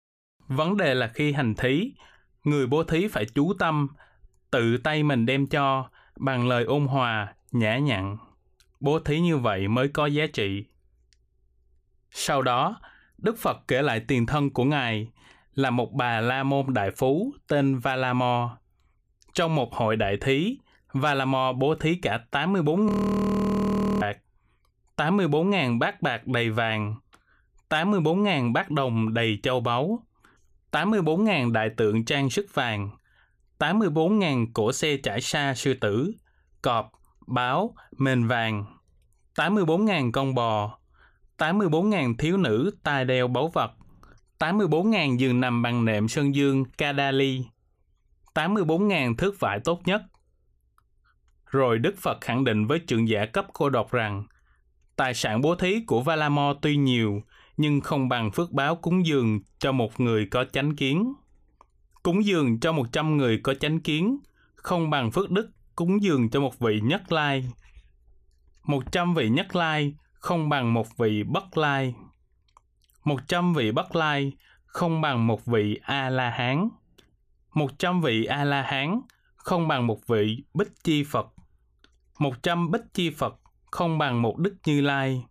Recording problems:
audio freezing; at 23 s for 1 s

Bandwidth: 15 kHz